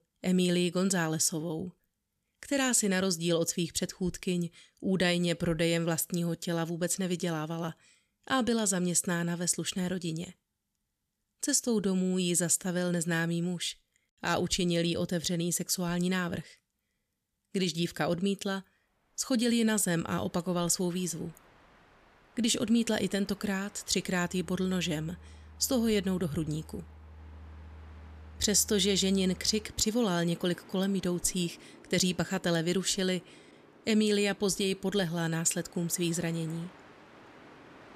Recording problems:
train or aircraft noise; faint; from 19 s on; 25 dB below the speech

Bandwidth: 14.5 kHz